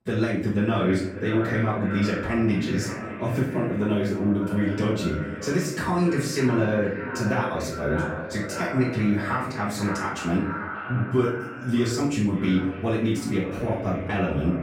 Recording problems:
echo of what is said; strong; throughout; 580 ms later, 9 dB below the speech
off-mic speech; far
room echo; noticeable; dies away in 0.5 s

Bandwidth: 16 kHz